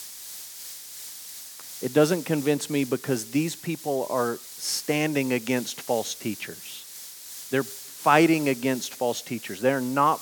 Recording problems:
hiss; noticeable; throughout; 15 dB below the speech

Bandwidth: 18.5 kHz